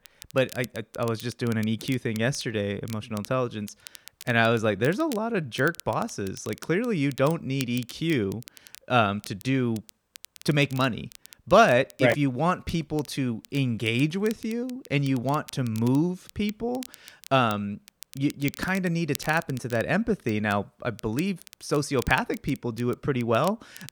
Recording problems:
crackle, like an old record; noticeable; 20 dB below the speech

